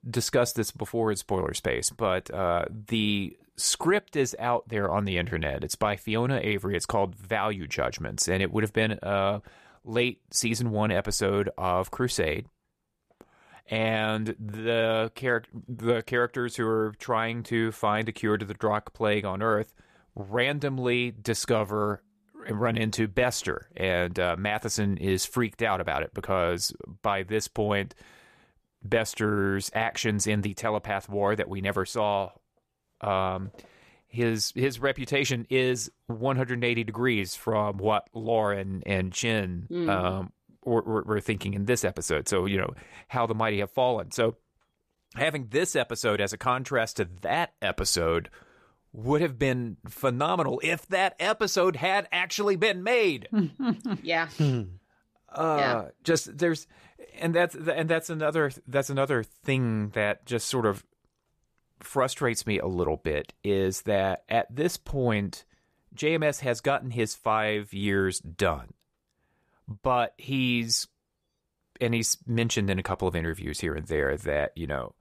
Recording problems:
none

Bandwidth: 14.5 kHz